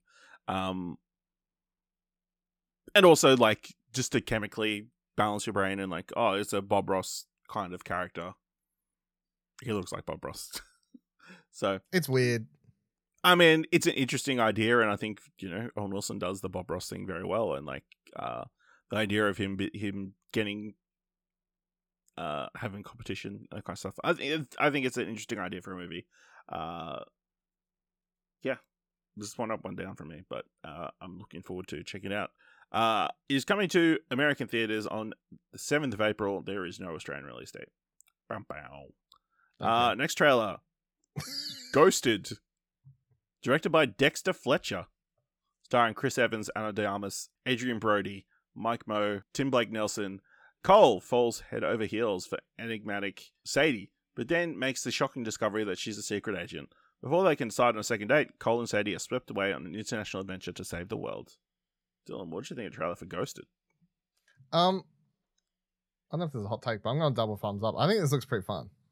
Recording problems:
none

